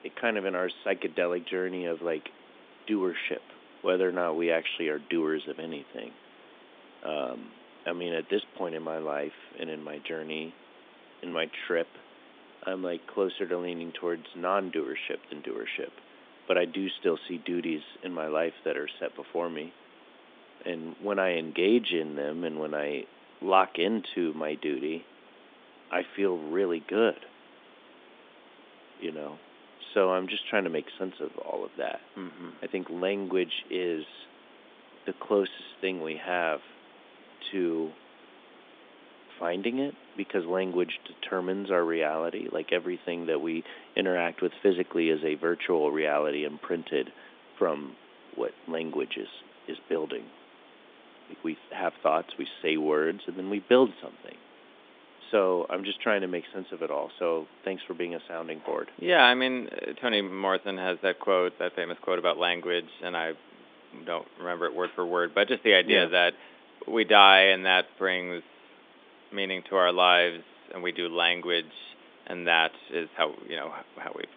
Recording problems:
phone-call audio; nothing above 3.5 kHz
hiss; faint; throughout; 25 dB below the speech

